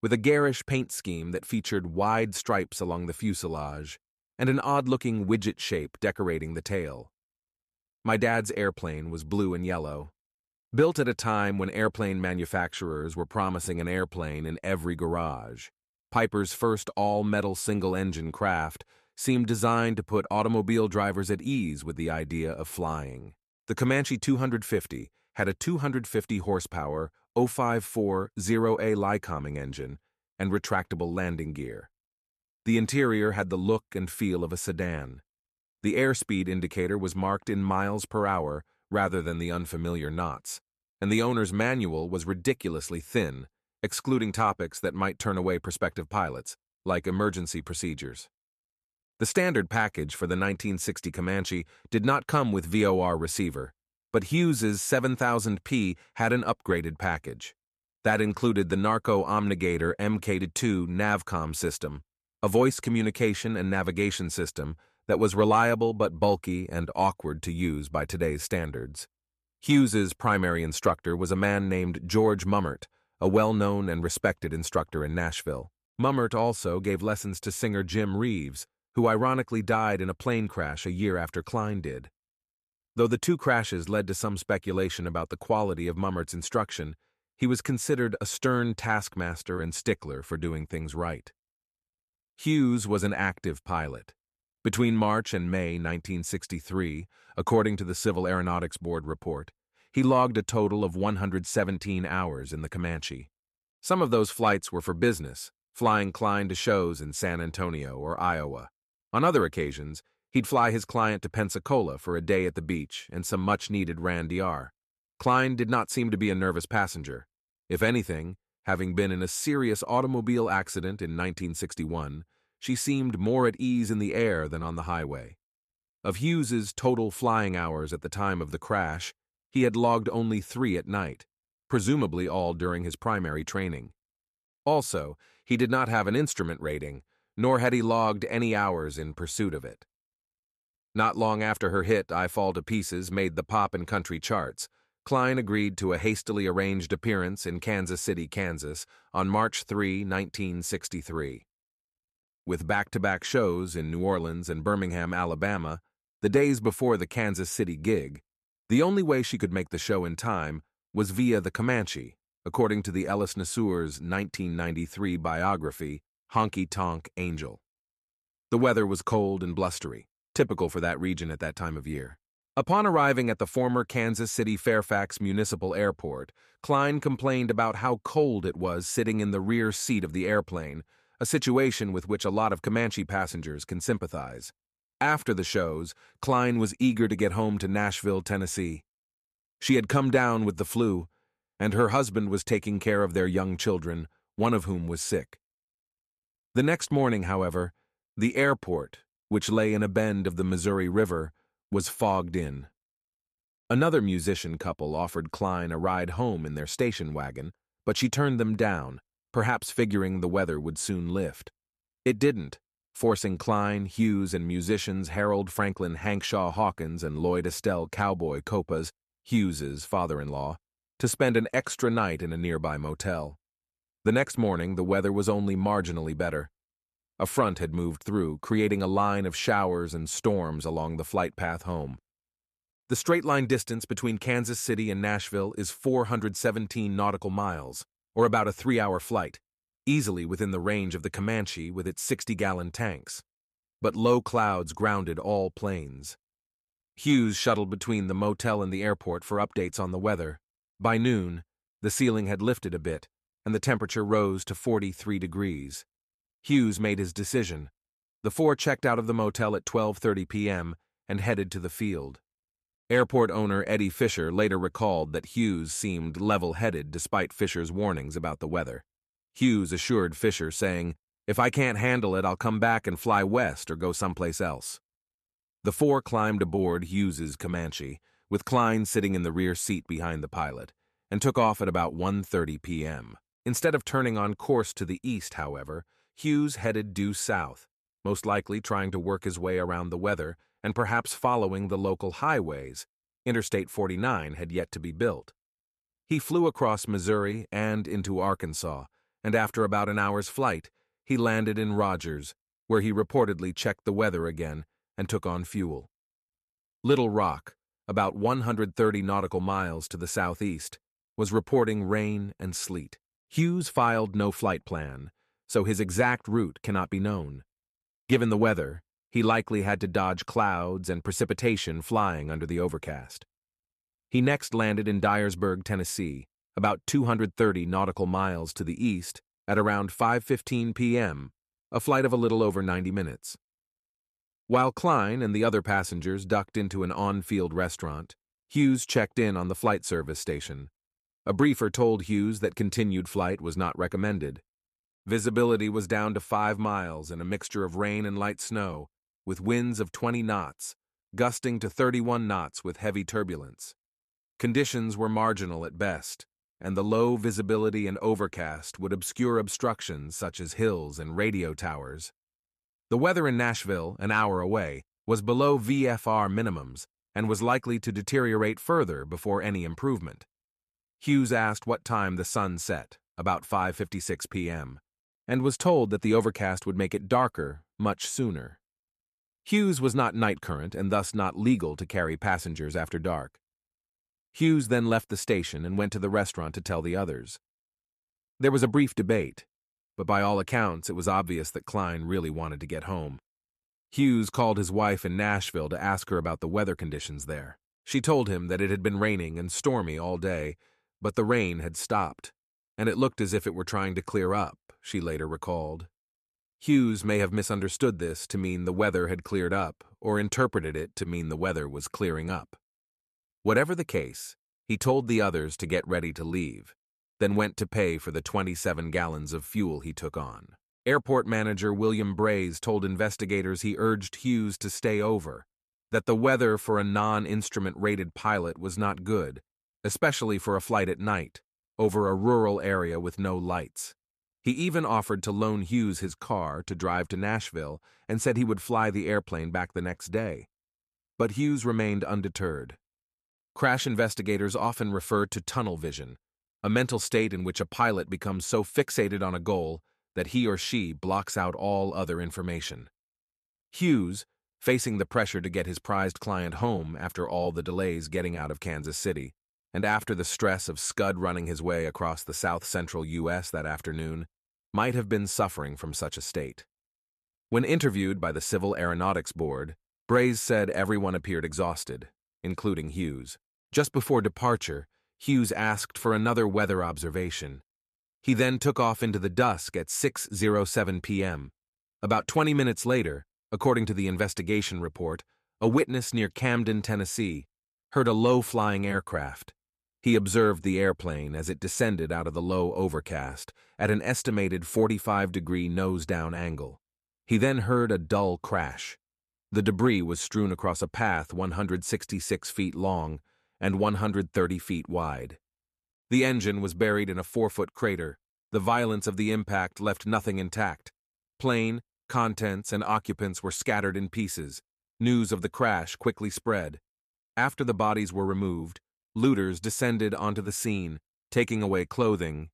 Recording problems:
none

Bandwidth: 13.5 kHz